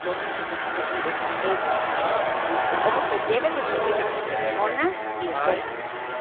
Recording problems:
phone-call audio; poor line; nothing above 3.5 kHz
traffic noise; very loud; throughout; 3 dB above the speech

